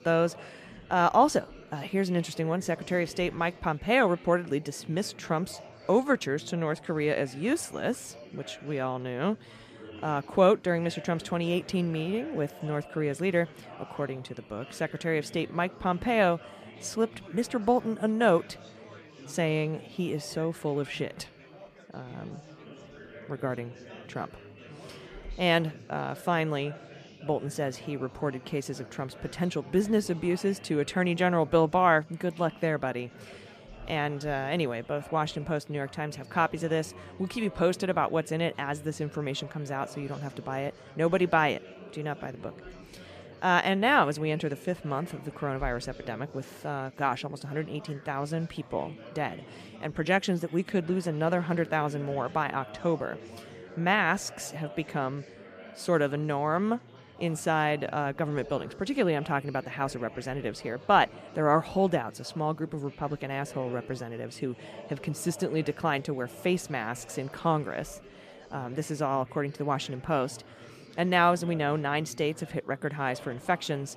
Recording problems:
chatter from many people; noticeable; throughout; 20 dB below the speech

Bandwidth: 14.5 kHz